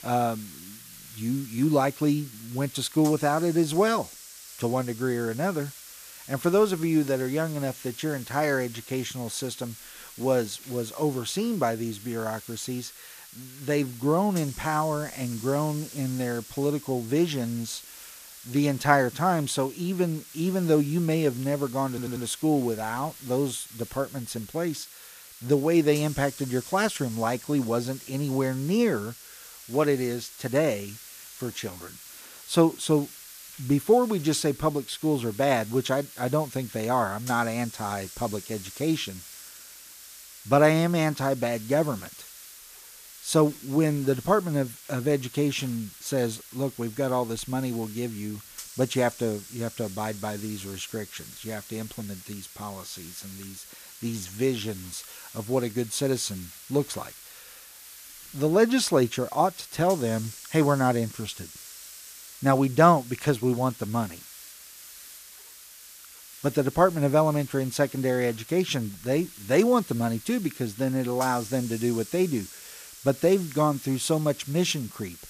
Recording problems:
hiss; noticeable; throughout; 15 dB below the speech
audio stuttering; at 22 s

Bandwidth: 14.5 kHz